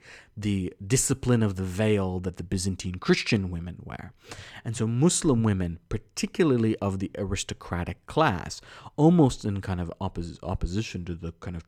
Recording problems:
none

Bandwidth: 18 kHz